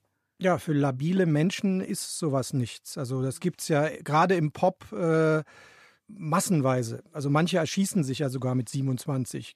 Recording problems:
none

